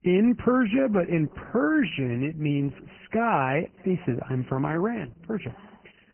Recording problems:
garbled, watery; badly
high frequencies cut off; severe; nothing above 3 kHz
chatter from many people; faint; throughout; 25 dB below the speech

